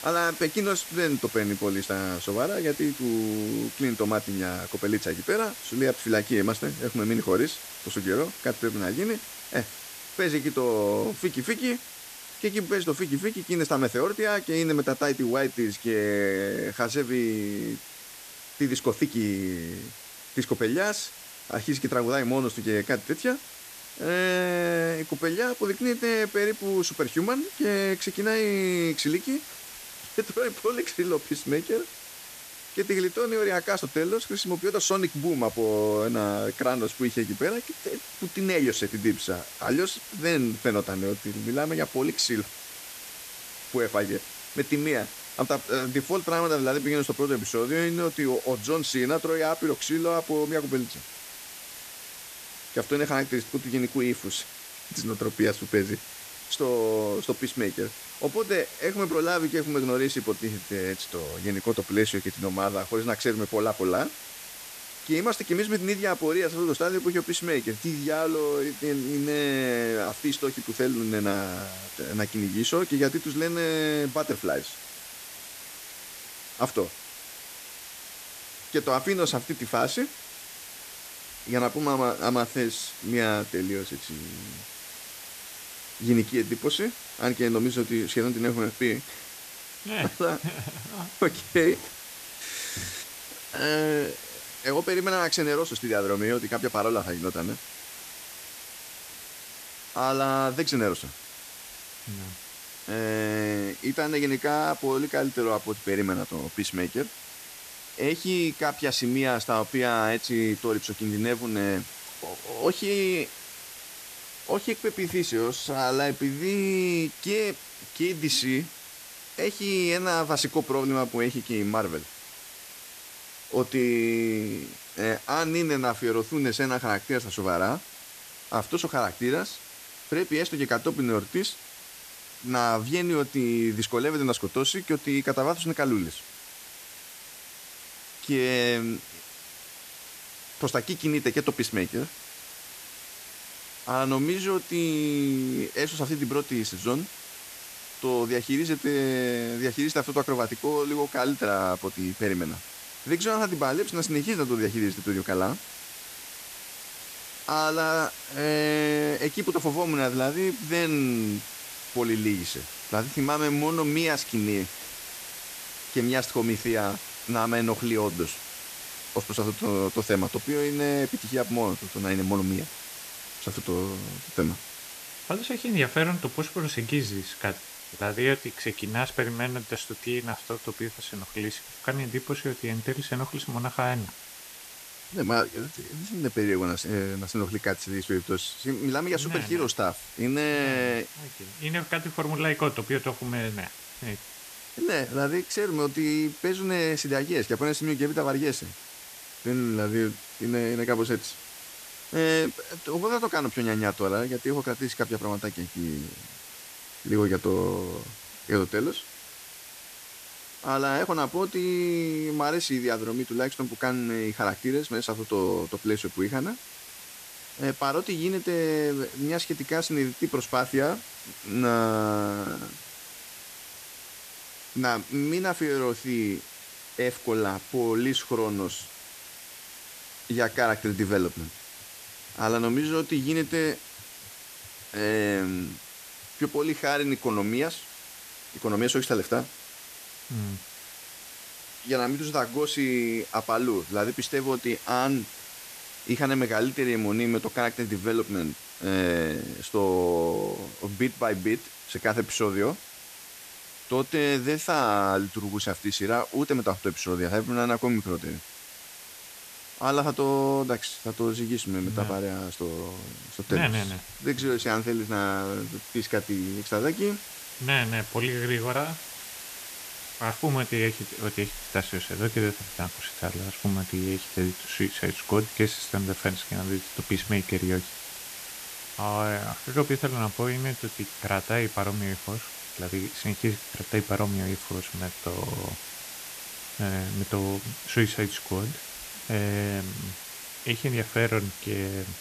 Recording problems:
hiss; noticeable; throughout; 10 dB below the speech

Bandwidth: 14.5 kHz